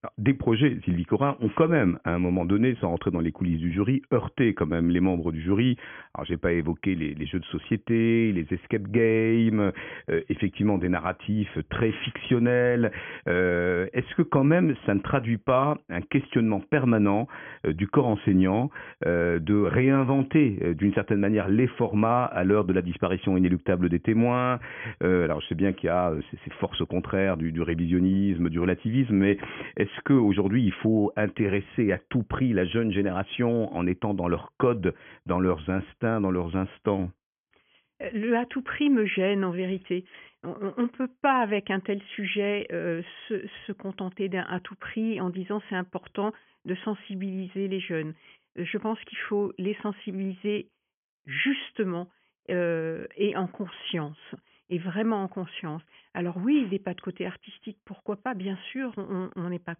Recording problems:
high frequencies cut off; severe; nothing above 3.5 kHz

